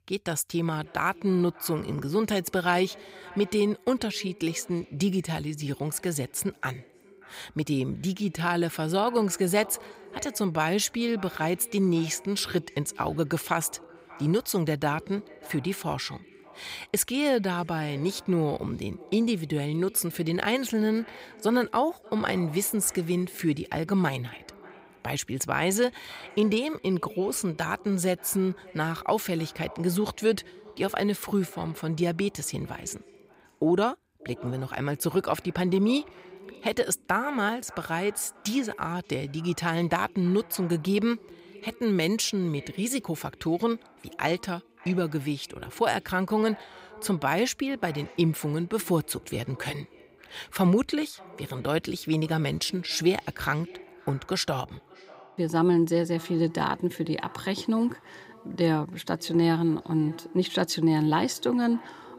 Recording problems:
echo of what is said; faint; throughout; 580 ms later, 20 dB below the speech

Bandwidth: 15.5 kHz